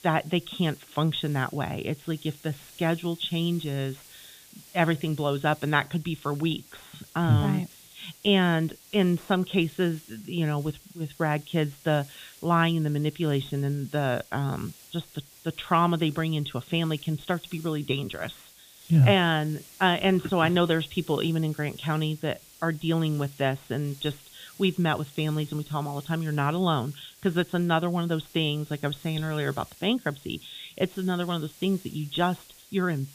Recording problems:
high frequencies cut off; severe; nothing above 4 kHz
hiss; faint; throughout; 20 dB below the speech

